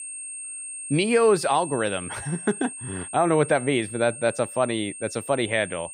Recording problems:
high-pitched whine; noticeable; throughout; 8.5 kHz, 10 dB below the speech

